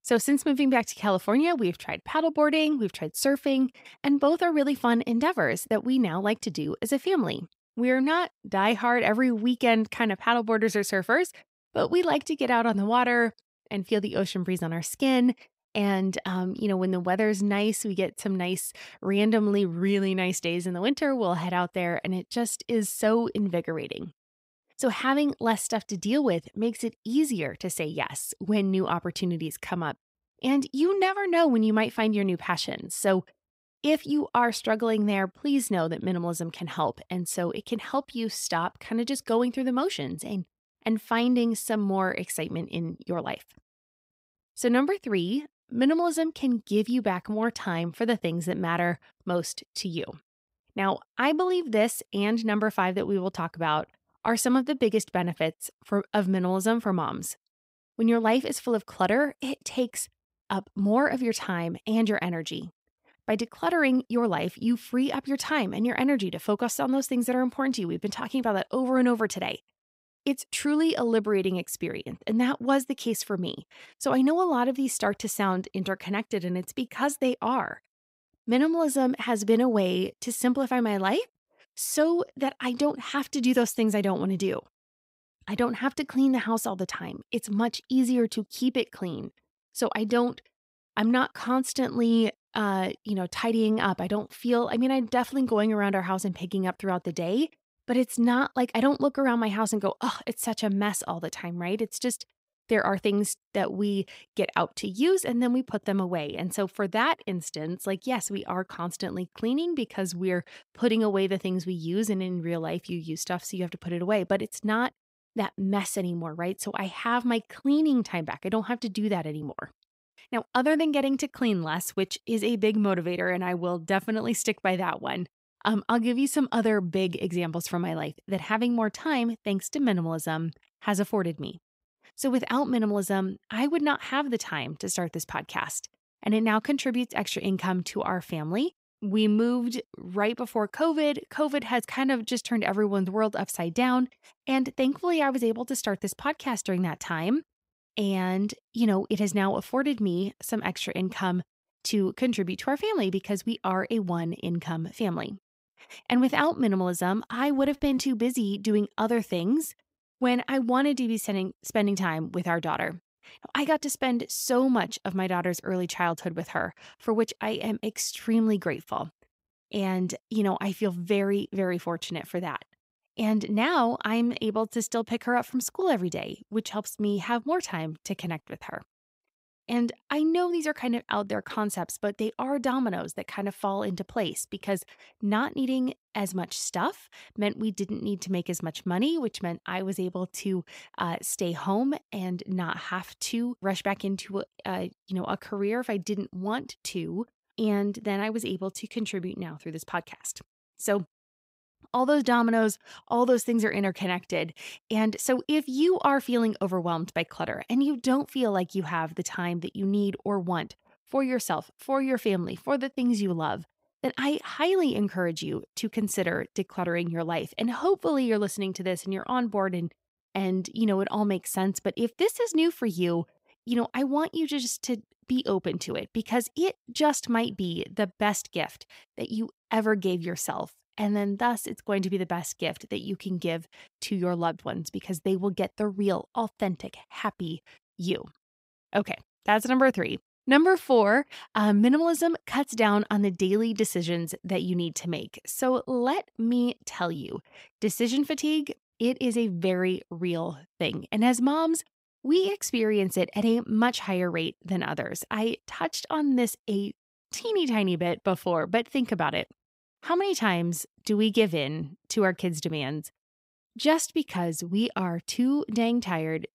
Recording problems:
none

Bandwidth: 15.5 kHz